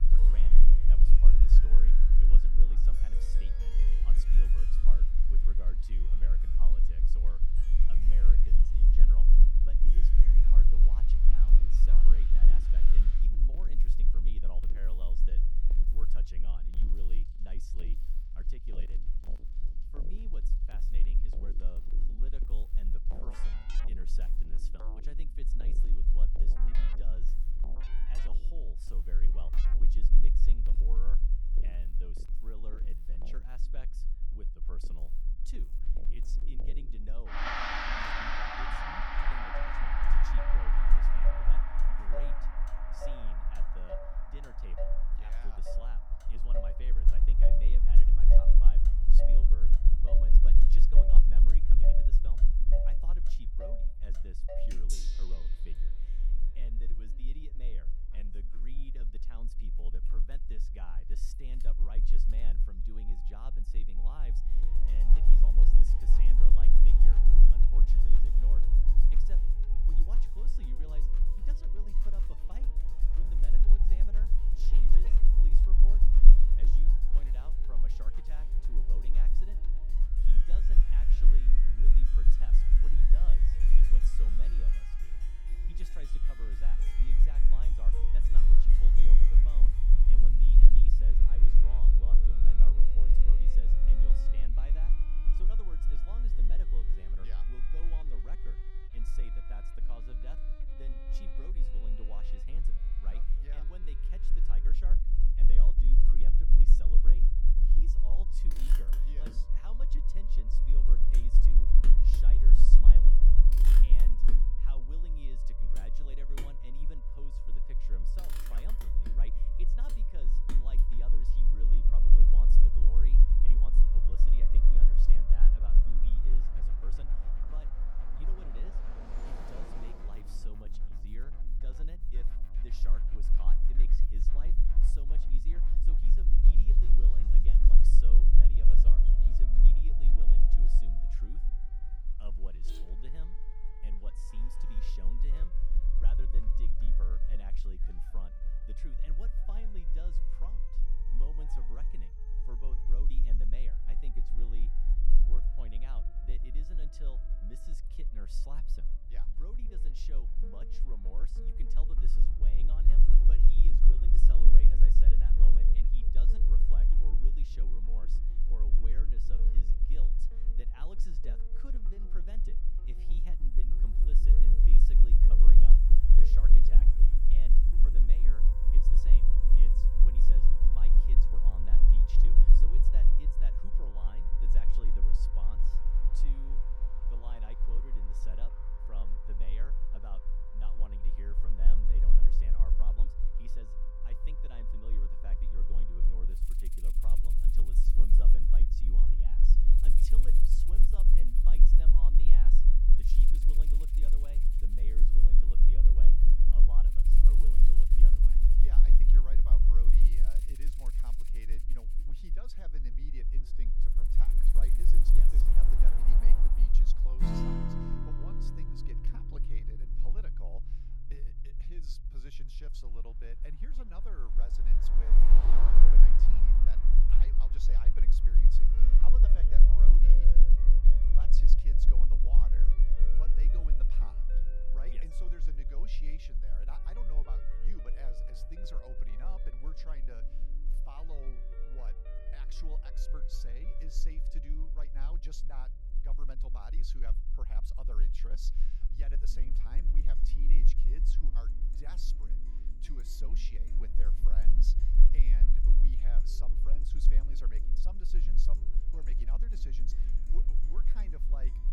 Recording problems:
background music; very loud; throughout; 4 dB above the speech
traffic noise; loud; throughout; 2 dB below the speech
low rumble; loud; throughout; 1 dB below the speech

